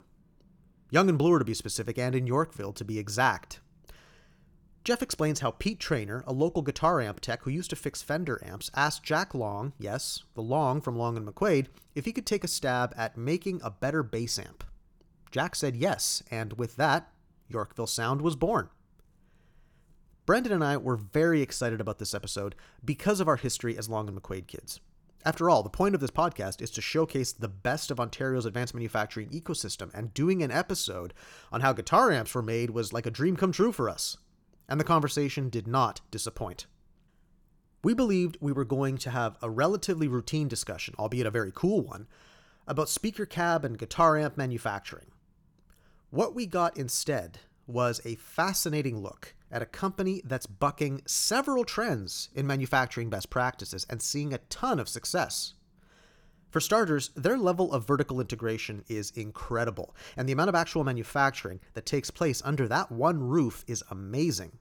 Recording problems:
none

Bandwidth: 18.5 kHz